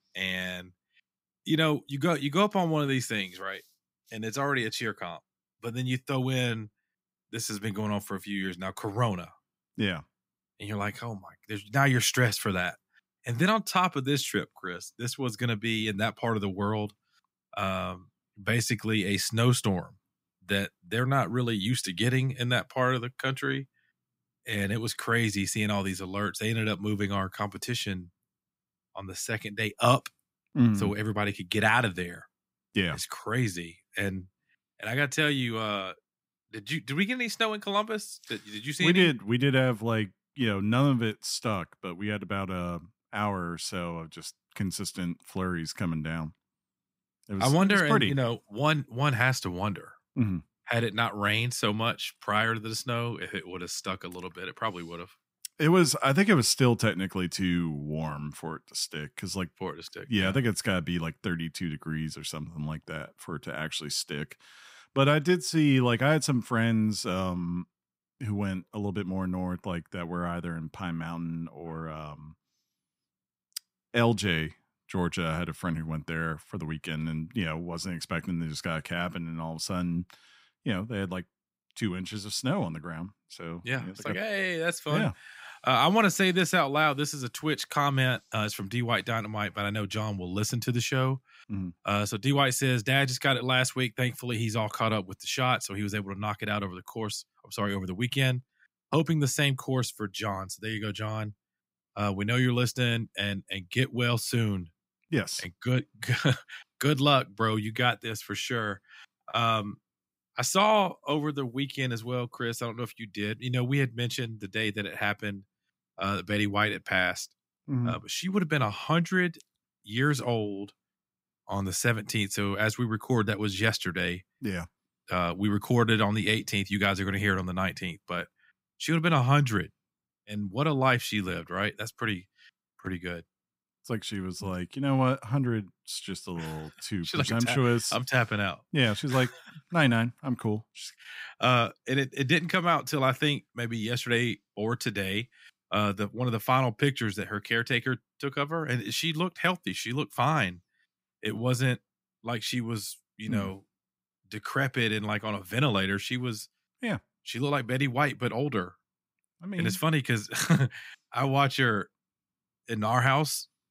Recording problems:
none

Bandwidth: 15.5 kHz